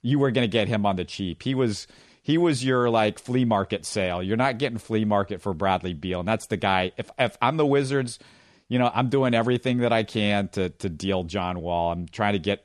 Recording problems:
none

